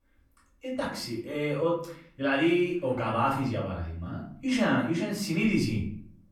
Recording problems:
off-mic speech; far
room echo; slight; dies away in 0.5 s

